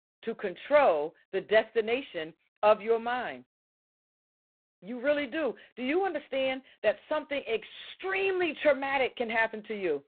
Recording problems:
phone-call audio; poor line; nothing above 4 kHz

